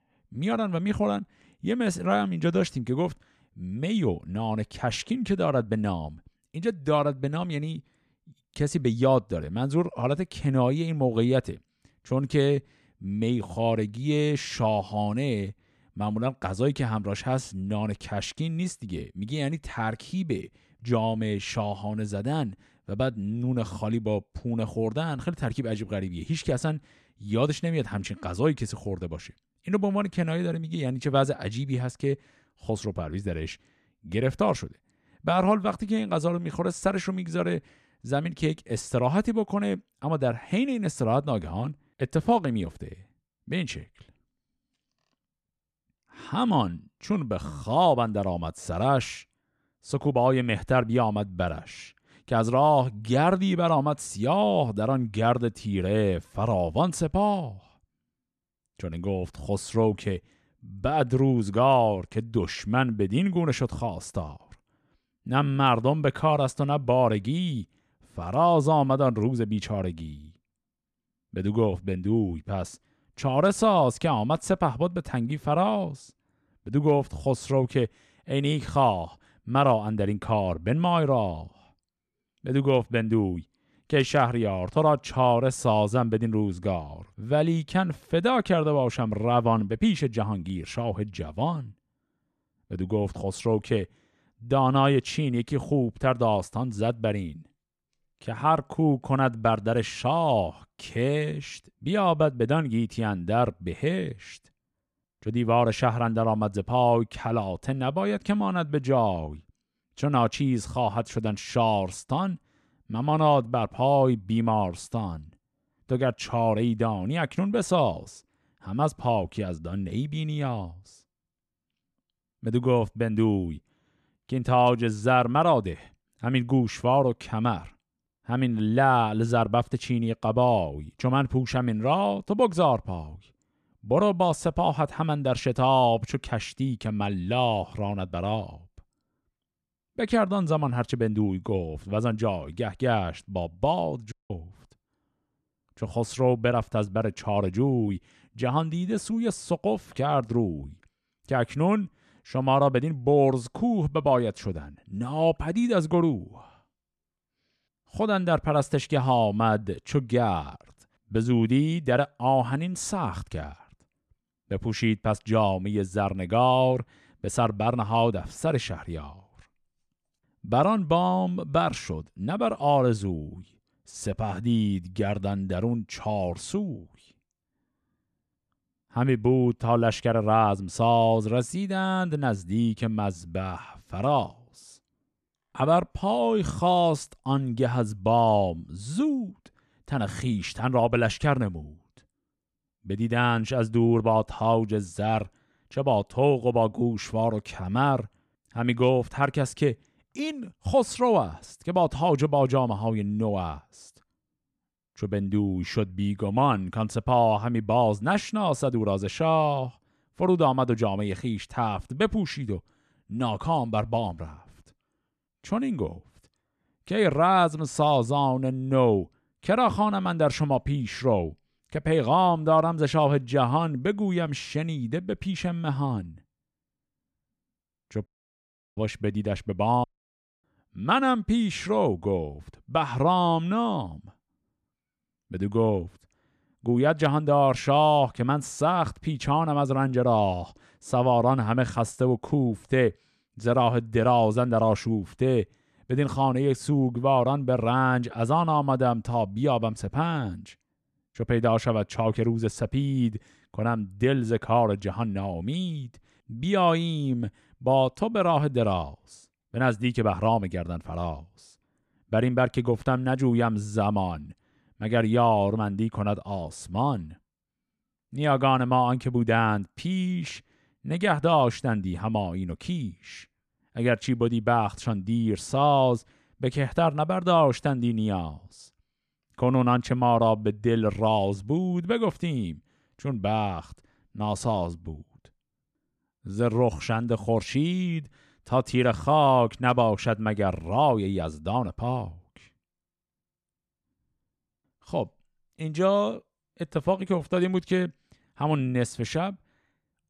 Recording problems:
audio cutting out; at 2:24, at 3:48 for 0.5 s and at 3:50 for 0.5 s

